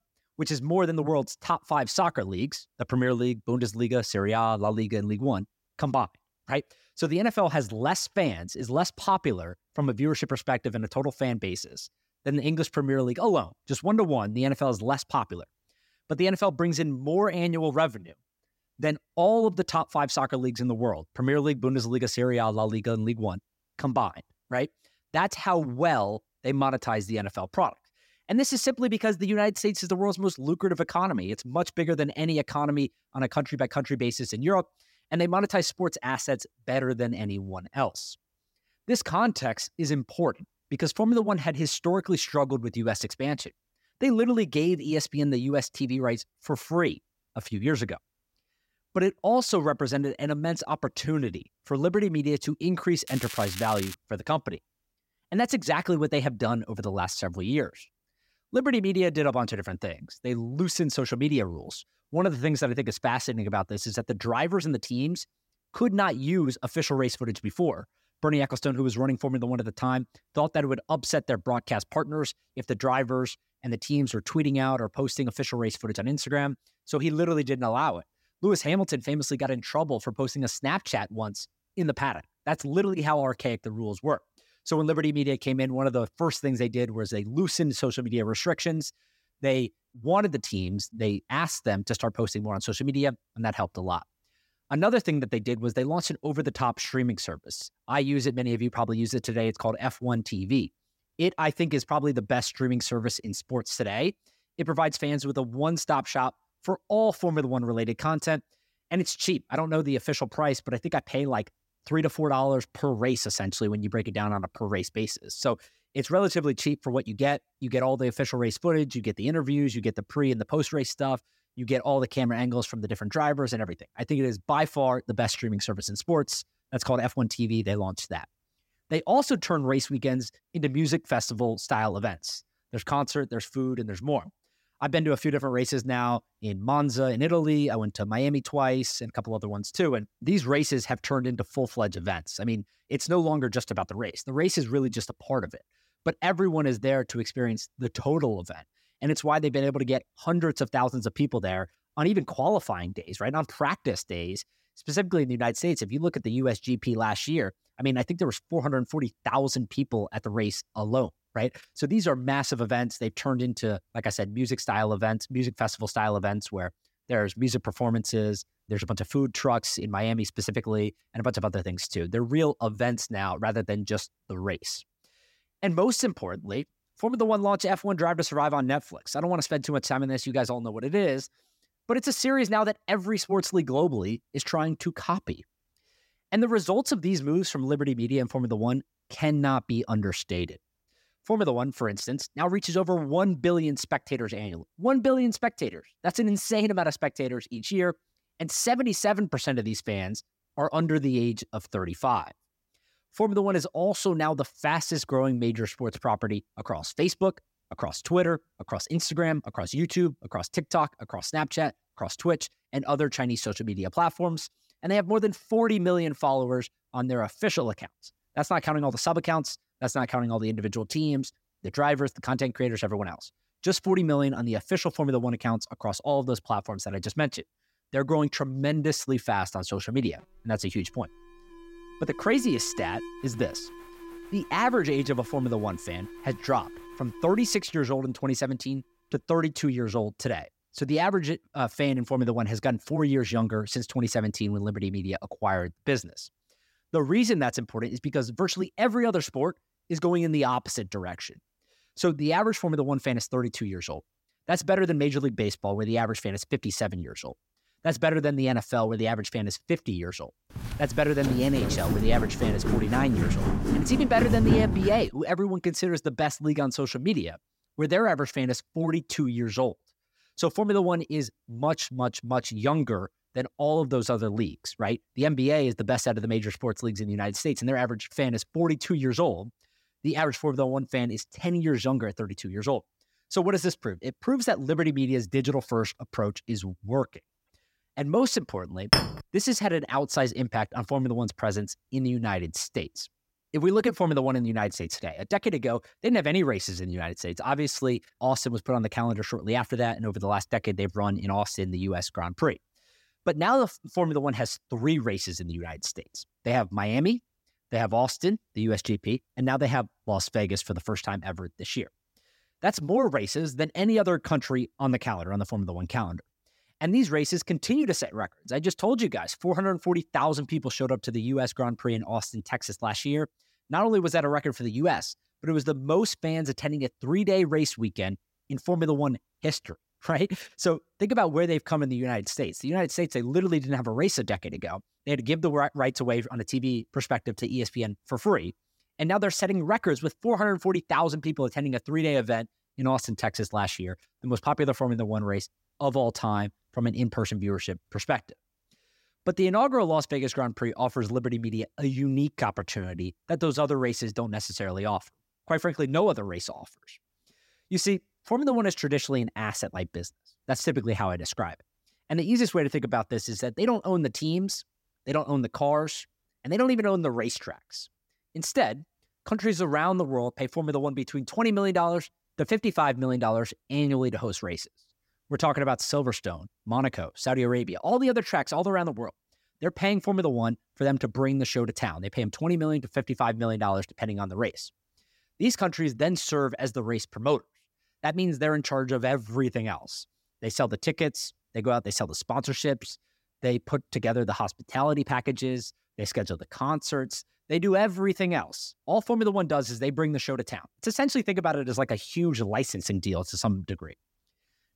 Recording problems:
crackling; loud; at 53 s; 10 dB below the speech
alarm; faint; from 3:50 to 3:58; peak 10 dB below the speech
footsteps; loud; from 4:21 to 4:25; peak 4 dB above the speech
clattering dishes; loud; at 4:49; peak 5 dB above the speech

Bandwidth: 16 kHz